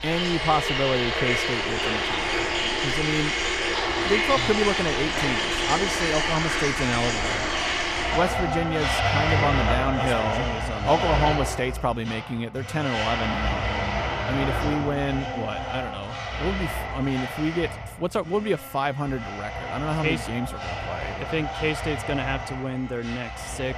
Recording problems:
household noises; very loud; throughout; 2 dB above the speech

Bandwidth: 14.5 kHz